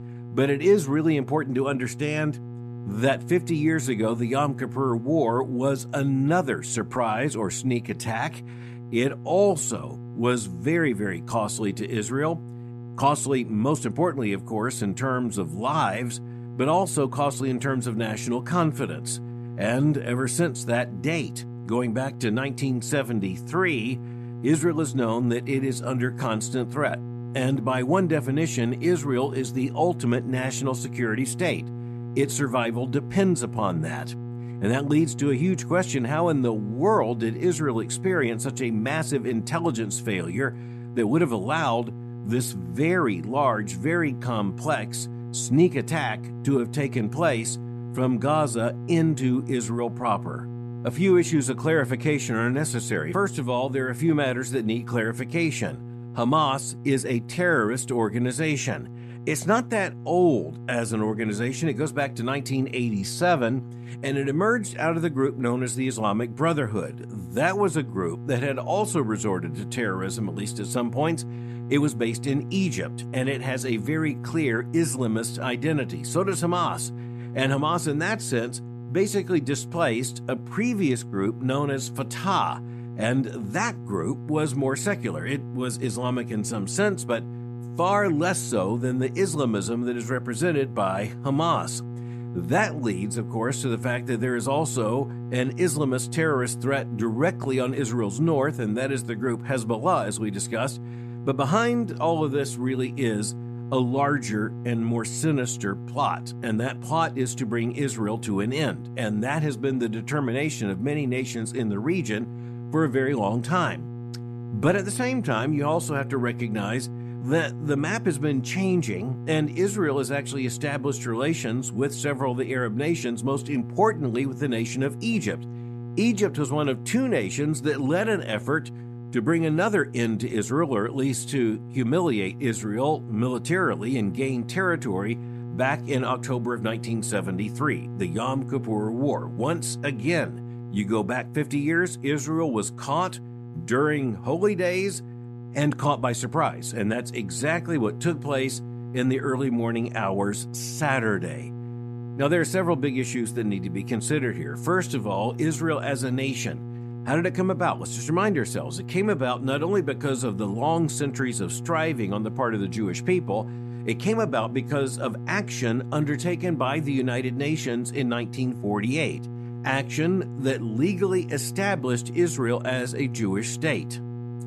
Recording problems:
electrical hum; noticeable; throughout; 60 Hz, 15 dB below the speech

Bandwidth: 14 kHz